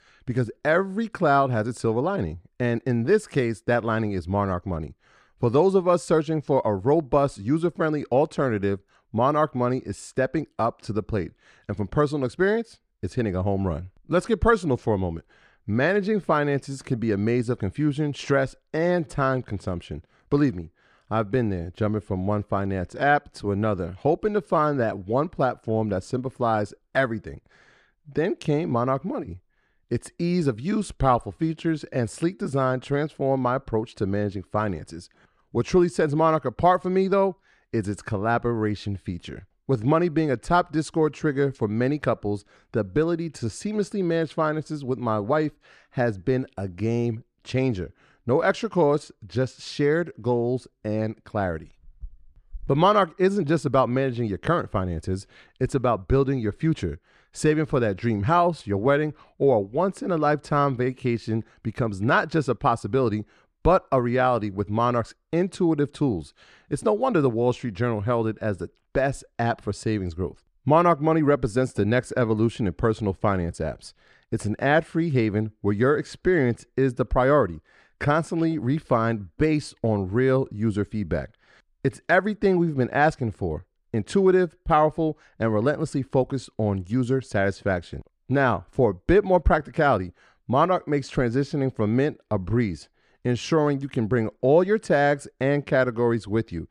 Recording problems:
none

